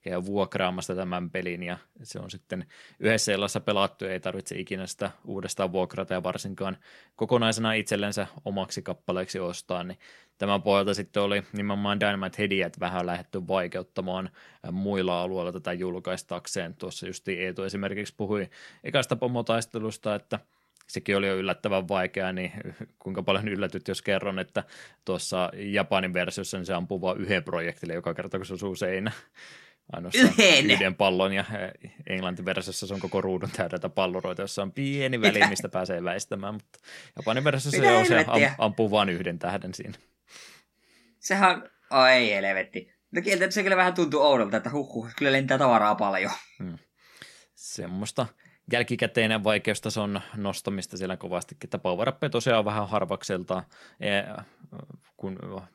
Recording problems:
none

